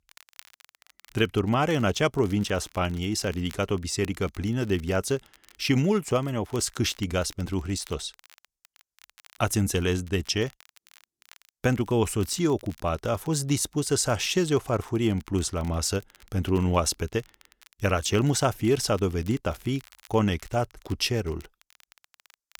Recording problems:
crackle, like an old record; faint; 25 dB below the speech

